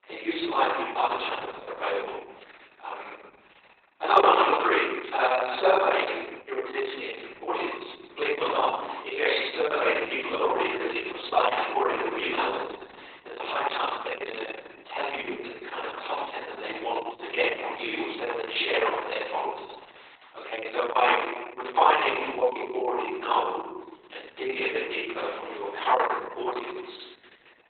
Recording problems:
off-mic speech; far
garbled, watery; badly; nothing above 4 kHz
thin; very; fading below 350 Hz
room echo; noticeable; dies away in 1.1 s

